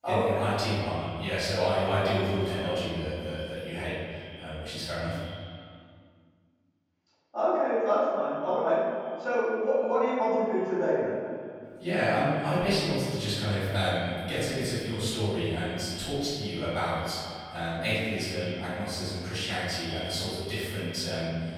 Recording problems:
room echo; strong; dies away in 1.8 s
off-mic speech; far
echo of what is said; noticeable; throughout; 160 ms later, 15 dB below the speech

